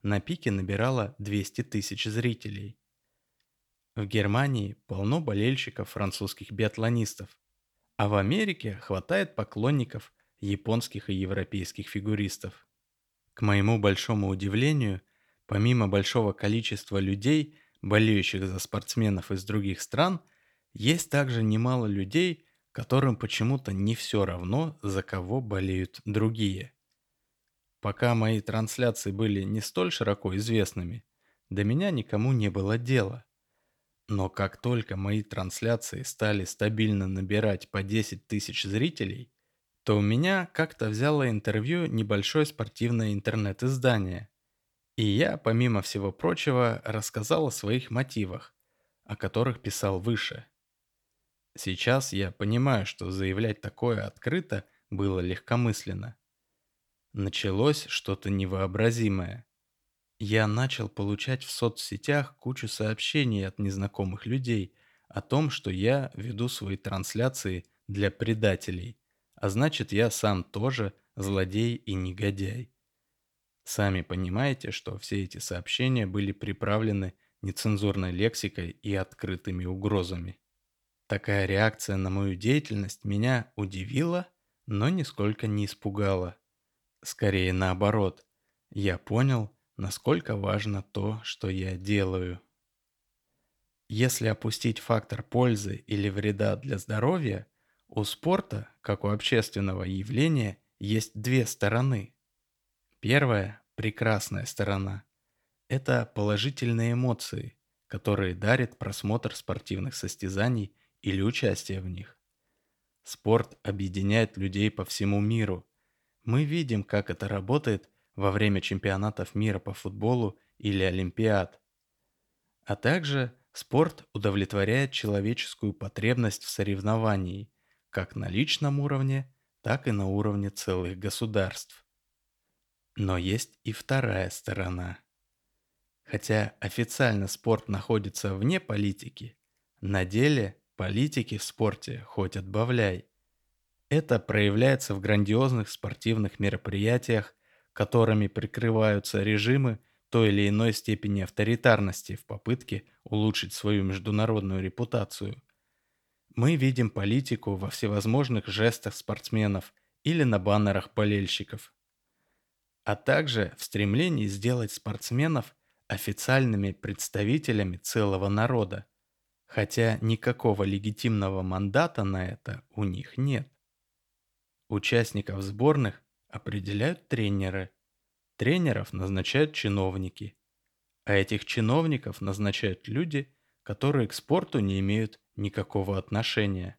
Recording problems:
none

